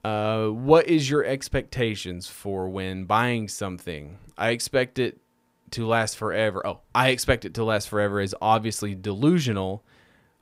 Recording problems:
none

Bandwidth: 15.5 kHz